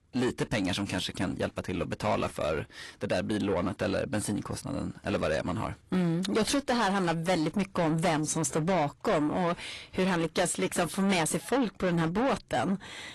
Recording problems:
distortion; heavy; 8 dB below the speech
garbled, watery; slightly; nothing above 11.5 kHz

